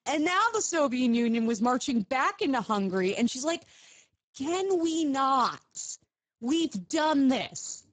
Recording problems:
garbled, watery; badly; nothing above 7.5 kHz

